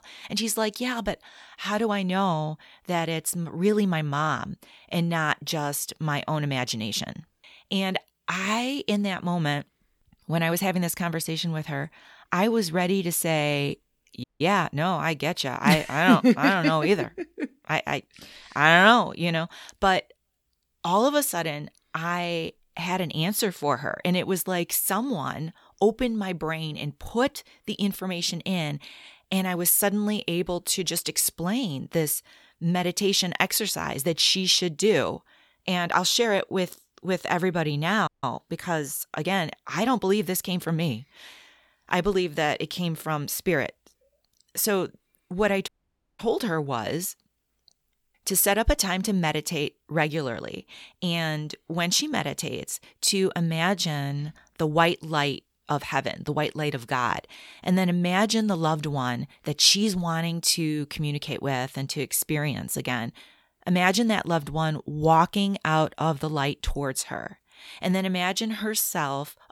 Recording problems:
audio cutting out; at 14 s, at 38 s and at 46 s for 0.5 s

